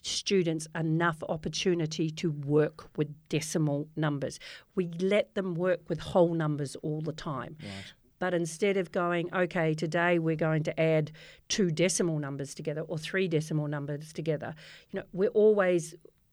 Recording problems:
none

